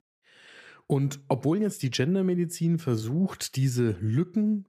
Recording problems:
none

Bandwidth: 14.5 kHz